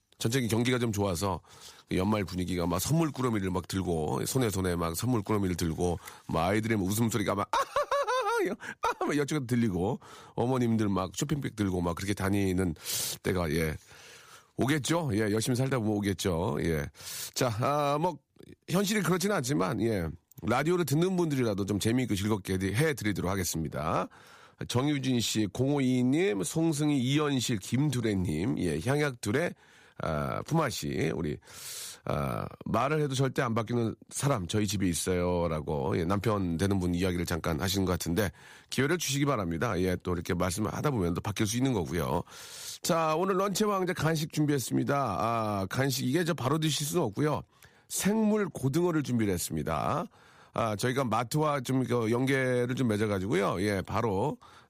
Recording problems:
none

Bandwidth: 15 kHz